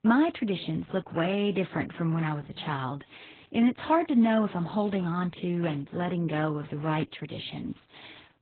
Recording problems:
garbled, watery; badly; nothing above 4 kHz

